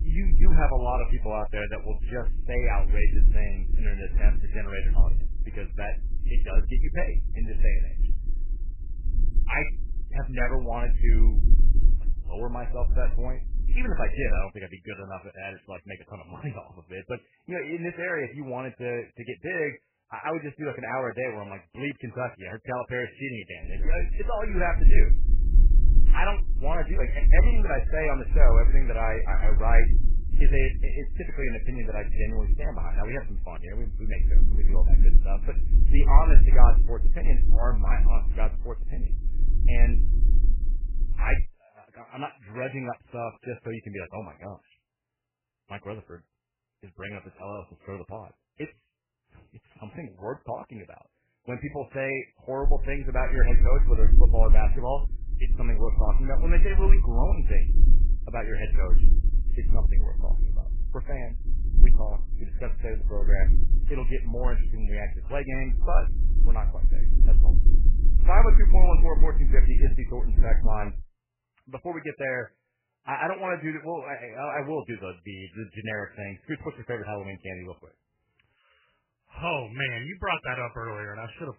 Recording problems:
garbled, watery; badly; nothing above 3 kHz
low rumble; noticeable; until 14 s, from 24 to 41 s and from 53 s to 1:11; 15 dB below the speech

